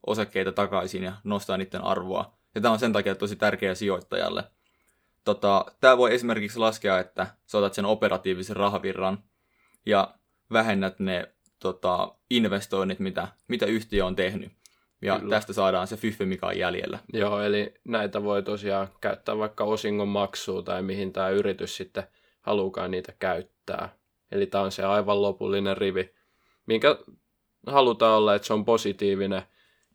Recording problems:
none

